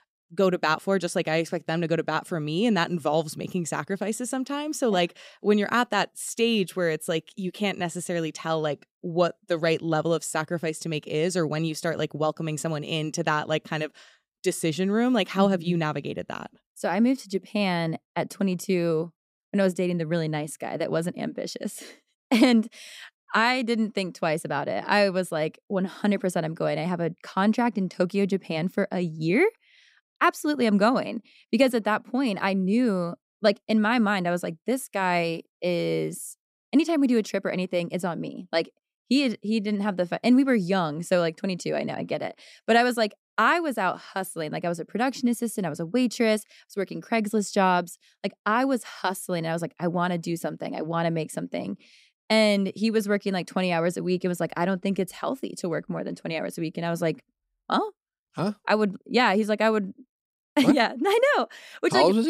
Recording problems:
abrupt cut into speech; at the end

